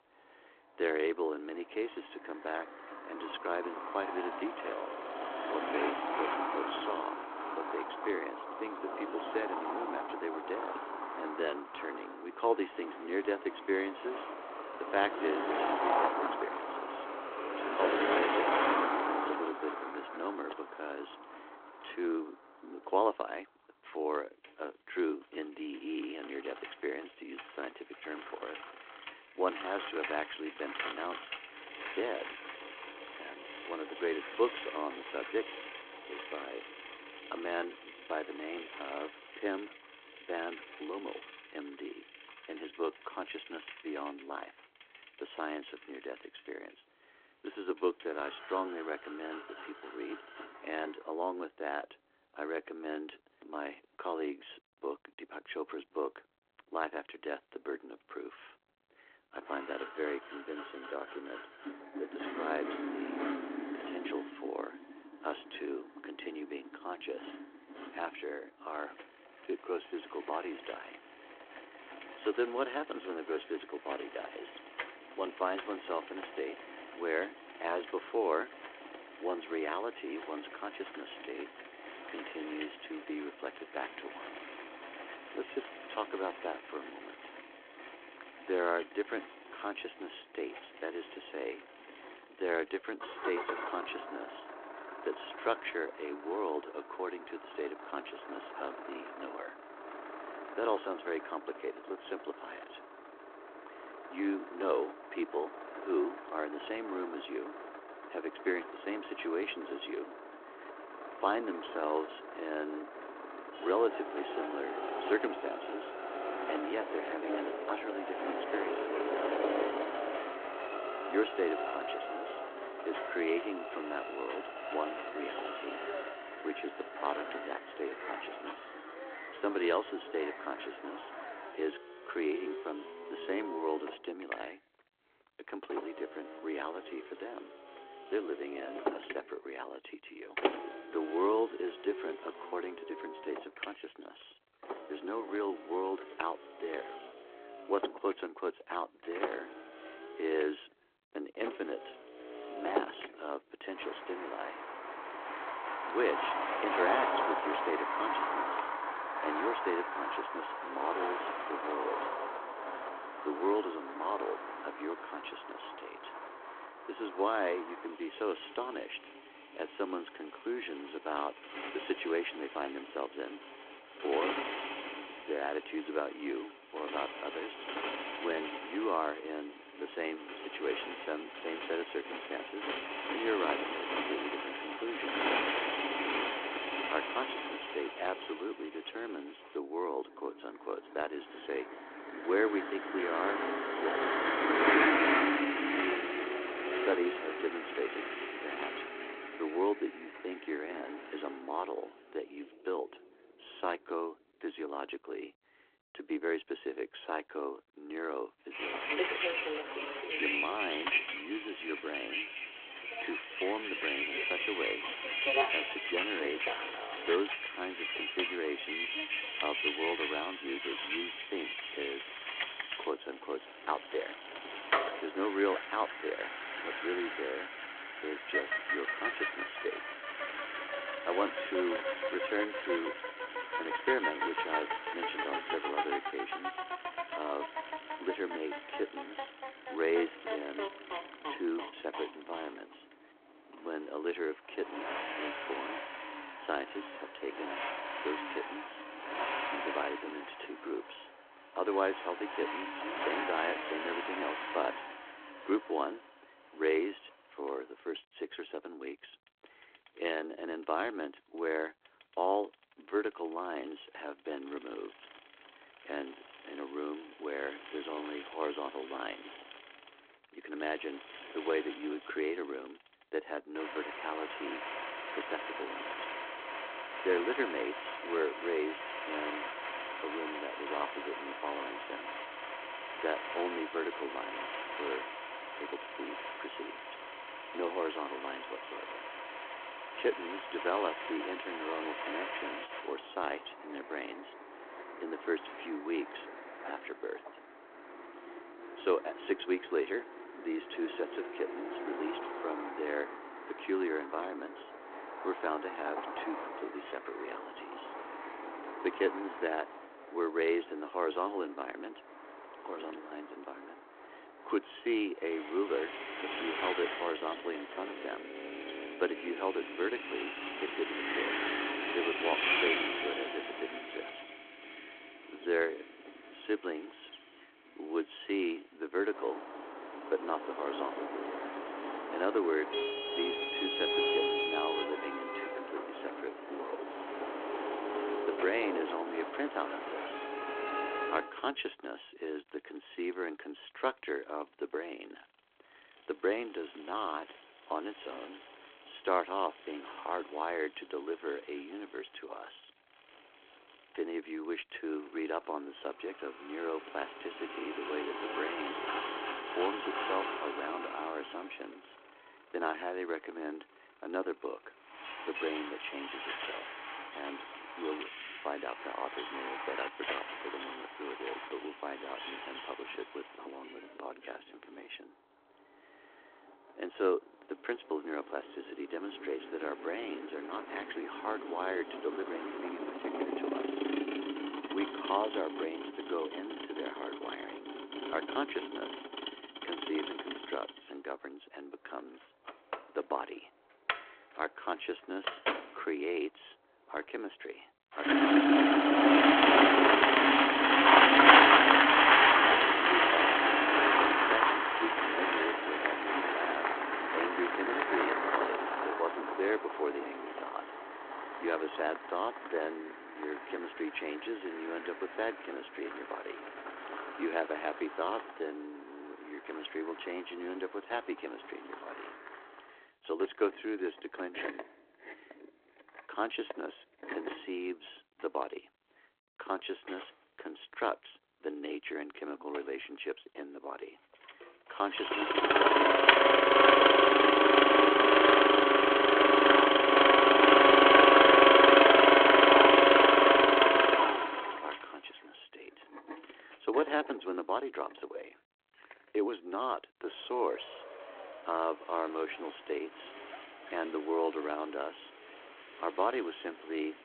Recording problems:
phone-call audio
traffic noise; very loud; throughout; 7 dB above the speech

